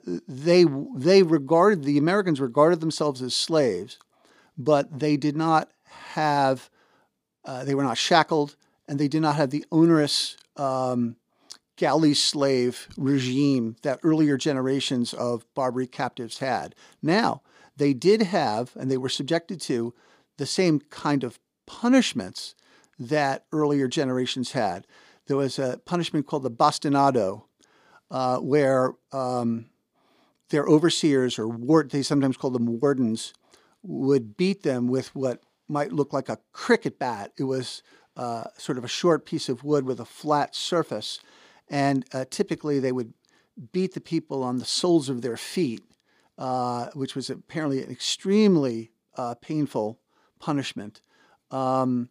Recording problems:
none

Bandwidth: 15 kHz